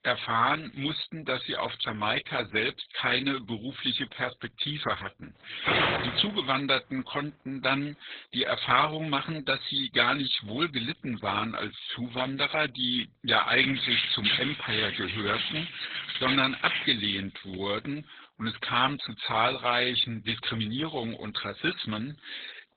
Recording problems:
garbled, watery; badly; nothing above 4 kHz
thin; somewhat; fading below 900 Hz
door banging; loud; at 5.5 s; peak 5 dB above the speech
jangling keys; loud; from 14 to 17 s; peak 4 dB above the speech

